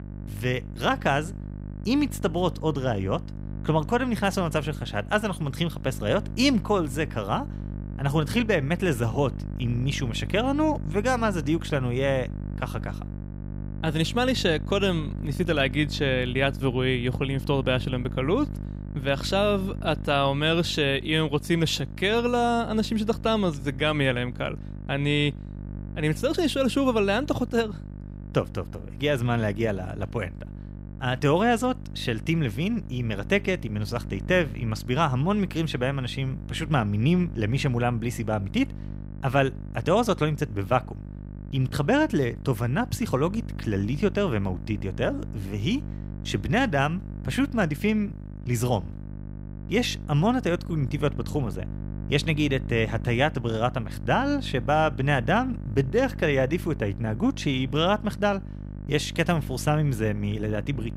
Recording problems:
electrical hum; noticeable; throughout; 50 Hz, 20 dB below the speech

